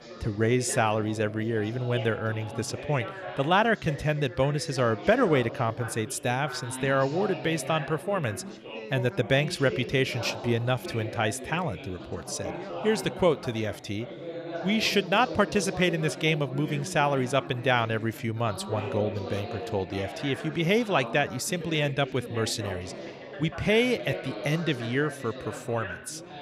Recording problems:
background chatter; noticeable; throughout; 4 voices, 10 dB below the speech

